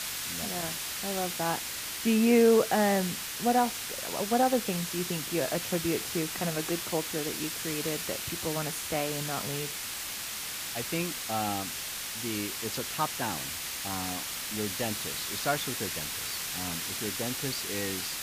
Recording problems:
hiss; loud; throughout; 2 dB below the speech

